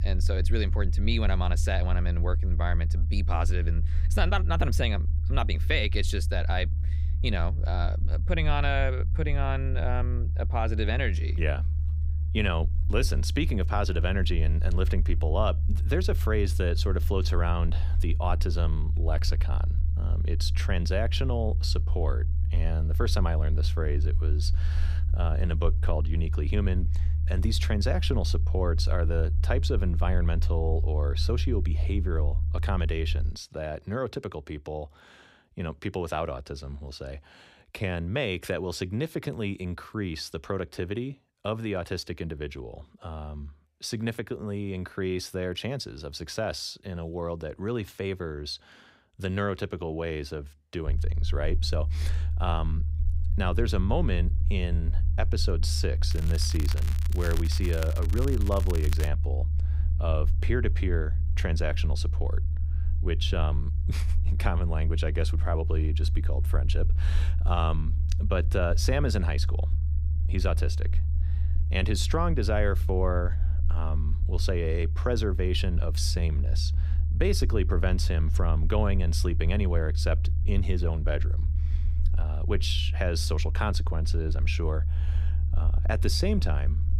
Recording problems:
low rumble; noticeable; until 33 s and from 51 s on; 15 dB below the speech
crackling; noticeable; from 56 to 59 s; 10 dB below the speech

